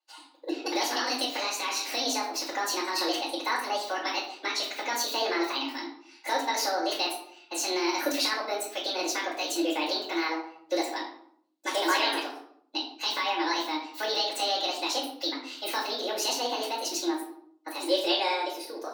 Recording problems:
off-mic speech; far
wrong speed and pitch; too fast and too high; 1.6 times normal speed
room echo; noticeable; dies away in 0.9 s
thin; somewhat; fading below 250 Hz

